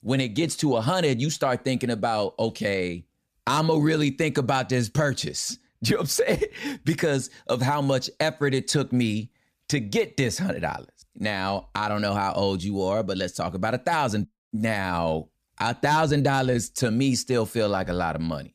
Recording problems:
none

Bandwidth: 14.5 kHz